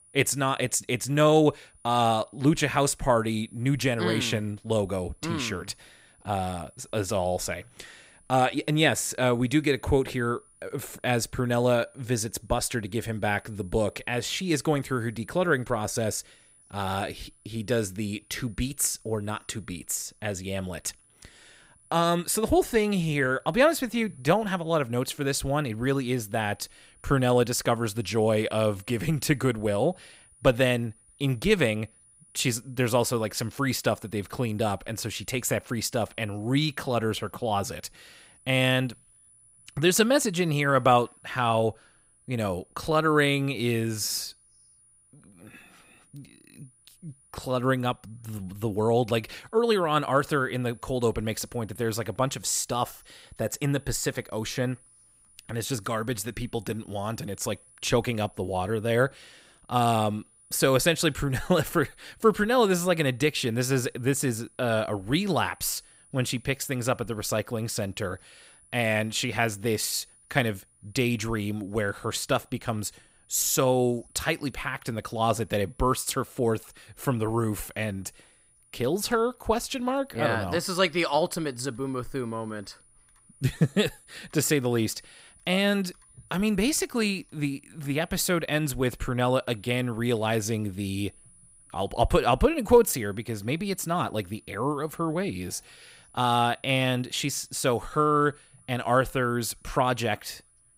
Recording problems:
high-pitched whine; faint; throughout; 10 kHz, 30 dB below the speech

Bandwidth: 15.5 kHz